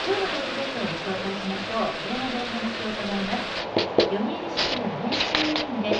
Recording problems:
off-mic speech; far
muffled; slightly; fading above 3.5 kHz
room echo; slight; dies away in 0.3 s
household noises; very loud; throughout; 4 dB above the speech
murmuring crowd; loud; throughout; 10 dB below the speech

